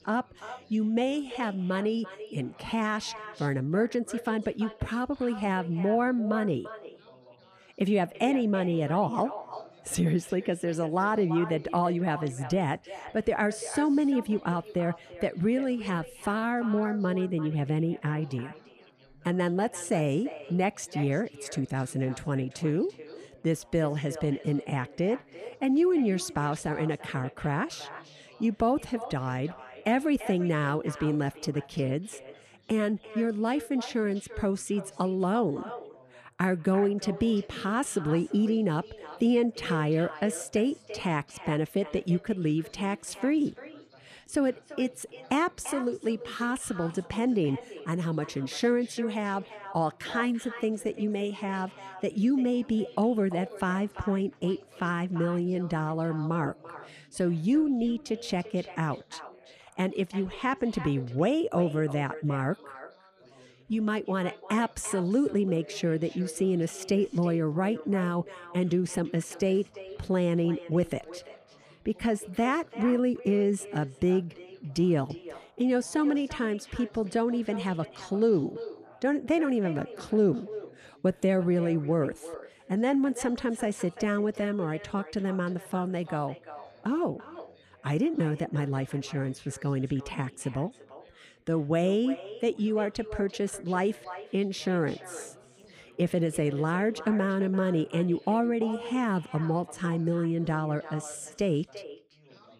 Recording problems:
echo of what is said; noticeable; throughout; 340 ms later, 15 dB below the speech
background chatter; faint; throughout; 4 voices, 30 dB below the speech

